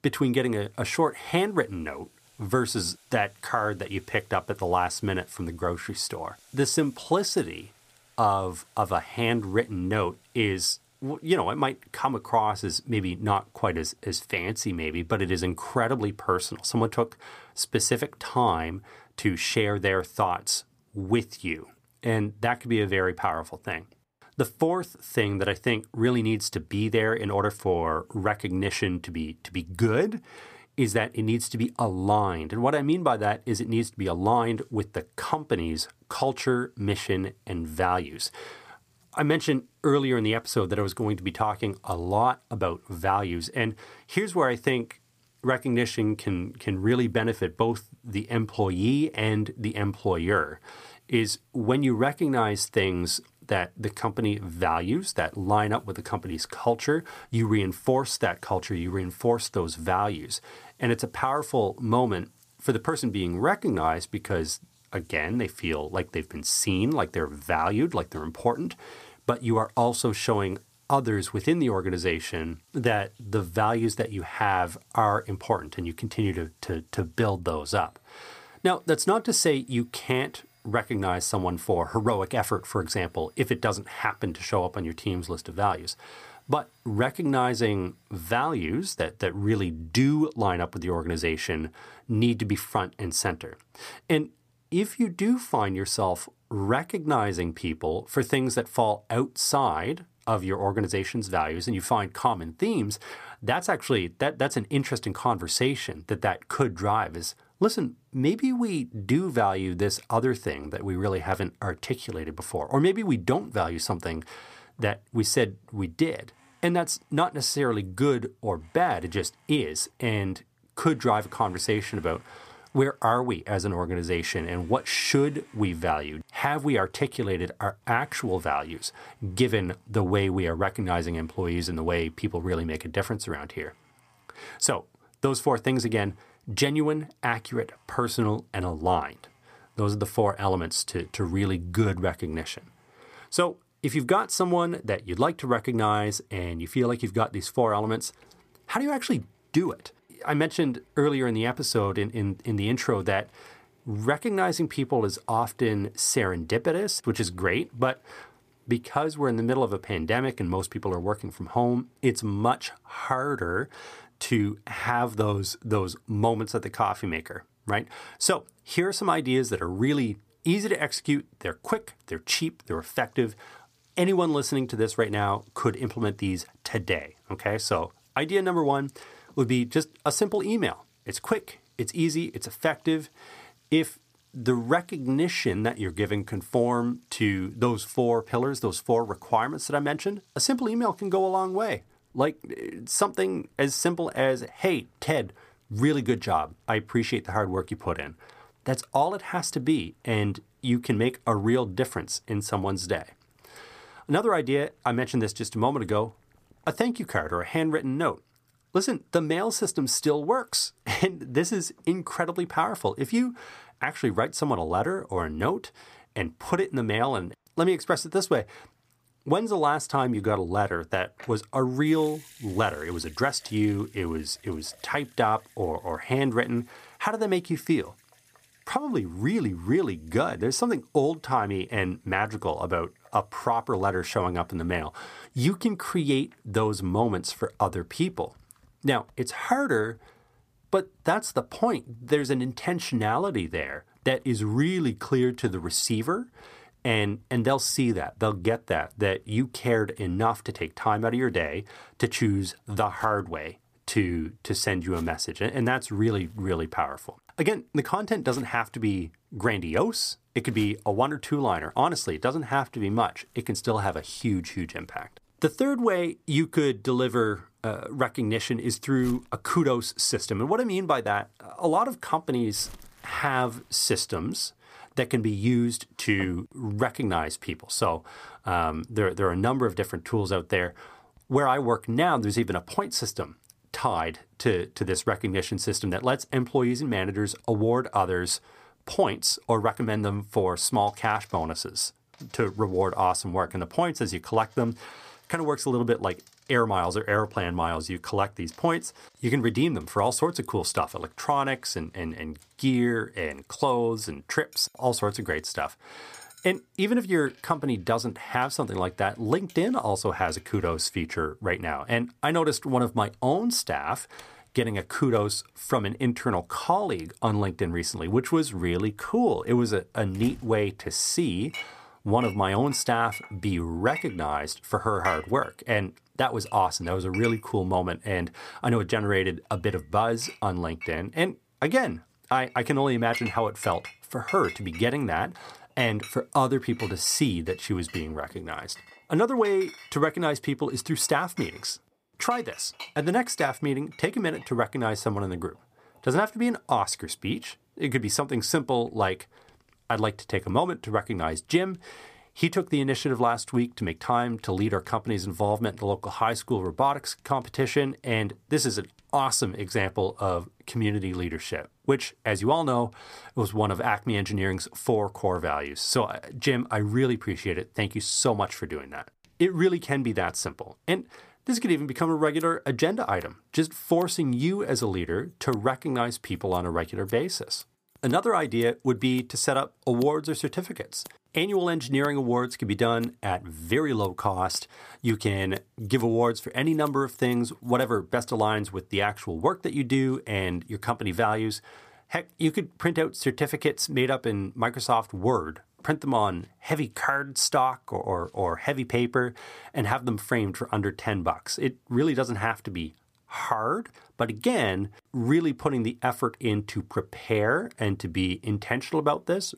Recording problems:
household noises; faint; throughout; 25 dB below the speech

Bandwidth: 15 kHz